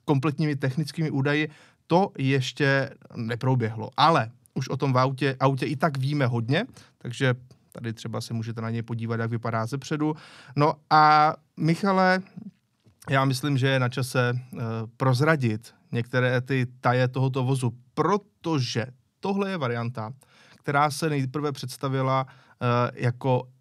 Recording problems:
none

